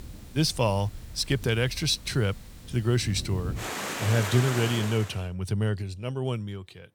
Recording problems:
rain or running water; loud; until 5 s; 8 dB below the speech

